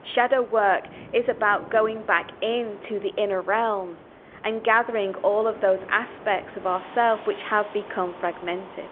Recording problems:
phone-call audio; nothing above 3.5 kHz
wind in the background; noticeable; throughout; 20 dB below the speech

